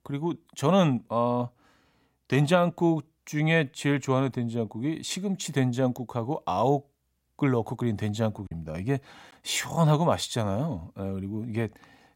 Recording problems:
choppy; occasionally; at 8.5 s; 2% of the speech affected

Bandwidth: 16 kHz